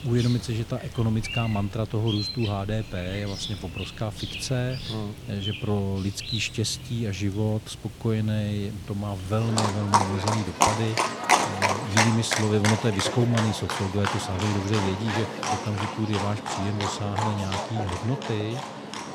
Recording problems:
animal sounds; loud; throughout; 1 dB below the speech

